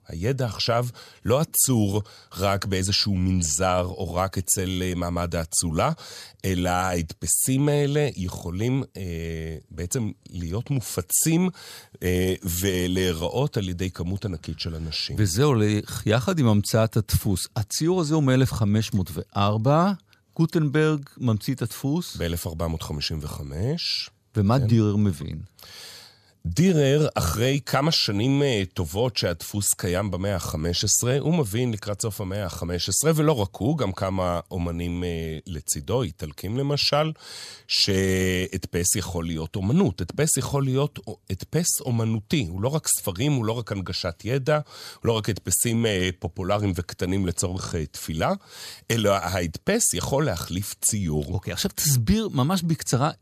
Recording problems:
none

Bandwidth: 14.5 kHz